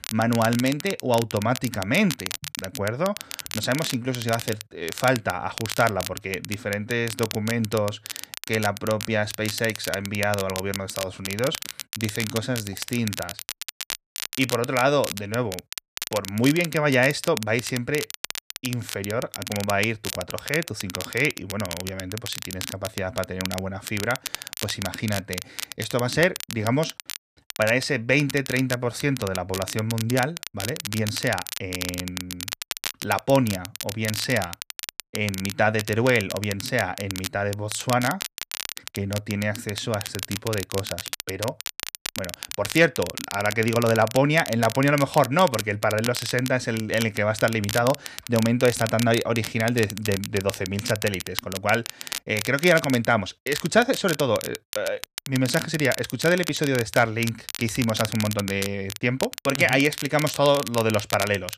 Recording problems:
crackle, like an old record; loud; 9 dB below the speech

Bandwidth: 14.5 kHz